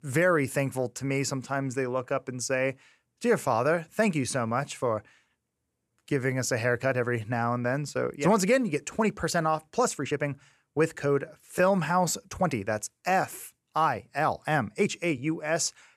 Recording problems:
uneven, jittery; strongly; from 4 to 15 s

